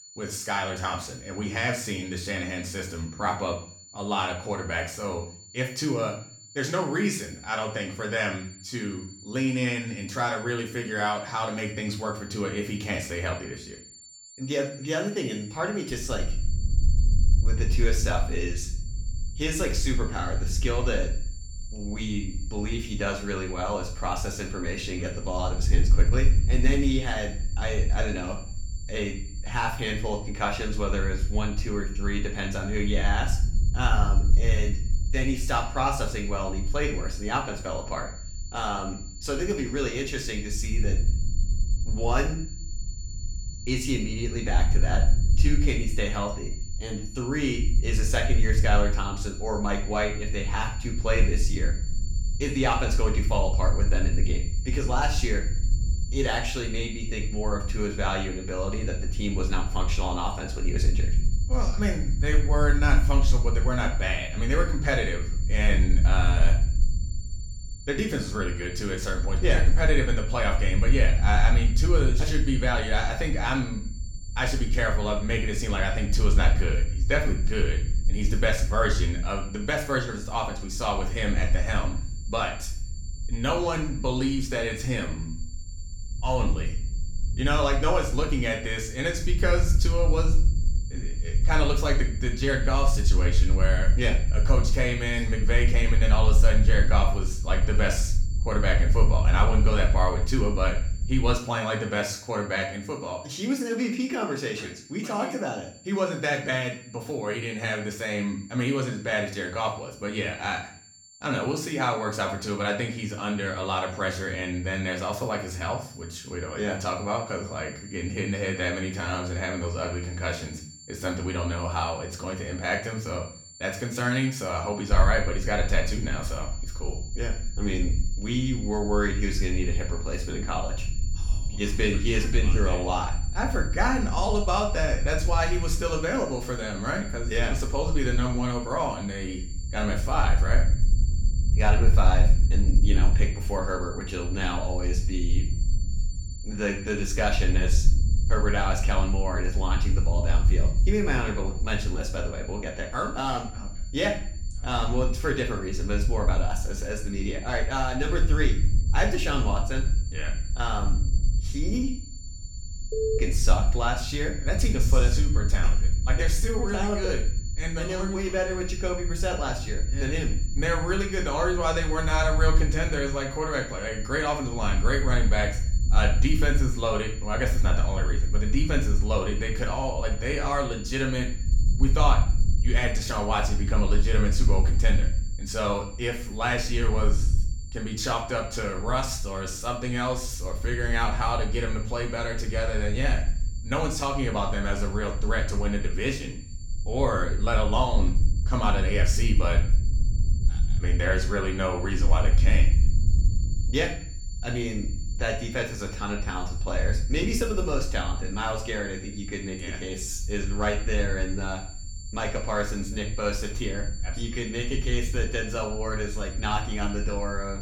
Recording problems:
room echo; slight; dies away in 0.5 s
off-mic speech; somewhat distant
high-pitched whine; noticeable; throughout; 7.5 kHz, 15 dB below the speech
low rumble; noticeable; from 16 s to 1:41 and from 2:05 on; 20 dB below the speech

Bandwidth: 17.5 kHz